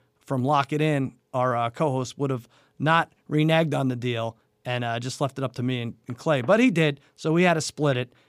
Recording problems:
none

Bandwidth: 15 kHz